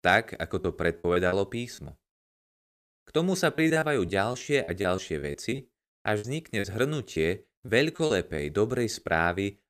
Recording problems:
choppy; very; at 0.5 s and from 3.5 to 8.5 s; 12% of the speech affected

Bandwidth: 14.5 kHz